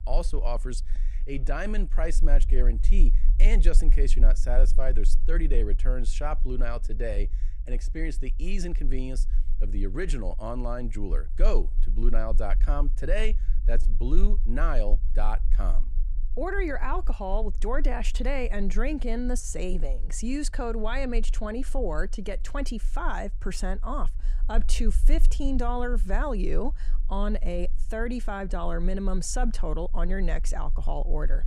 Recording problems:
low rumble; faint; throughout; 20 dB below the speech

